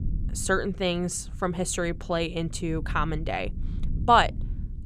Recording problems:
low rumble; faint; throughout; 25 dB below the speech

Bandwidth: 14.5 kHz